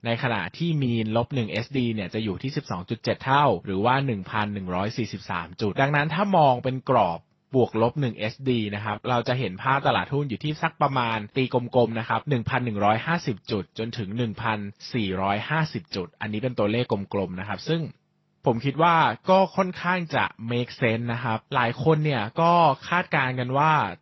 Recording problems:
garbled, watery; slightly; nothing above 5.5 kHz

